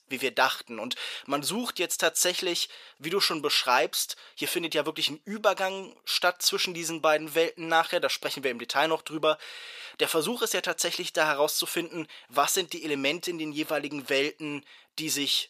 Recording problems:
thin; somewhat; fading below 500 Hz

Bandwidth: 14.5 kHz